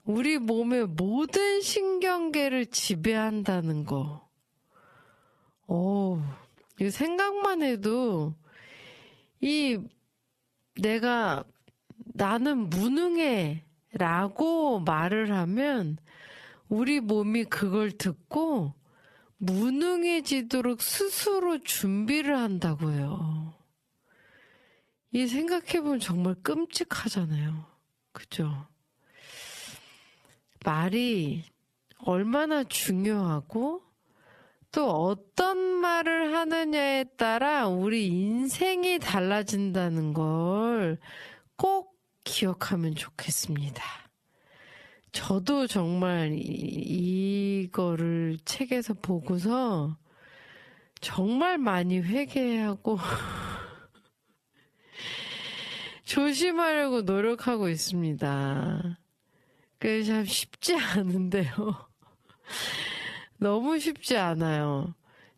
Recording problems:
squashed, flat; heavily
wrong speed, natural pitch; too slow; 0.6 times normal speed
audio stuttering; at 46 s, at 53 s and at 55 s

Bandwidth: 13.5 kHz